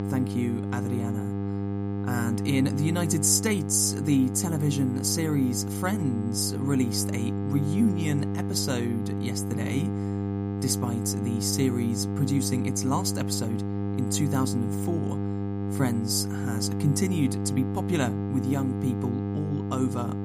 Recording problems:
electrical hum; loud; throughout; 50 Hz, 5 dB below the speech

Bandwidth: 15 kHz